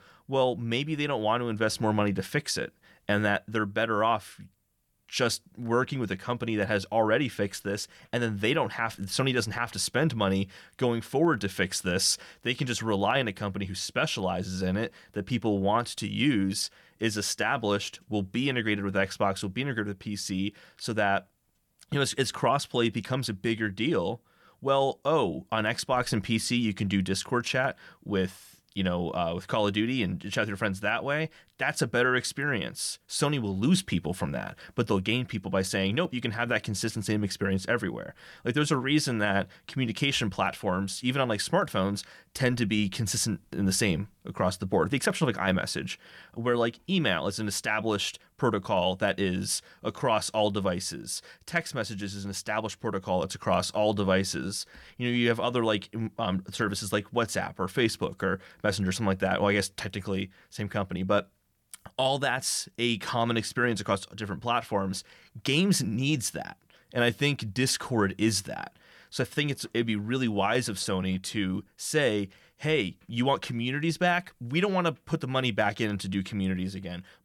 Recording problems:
none

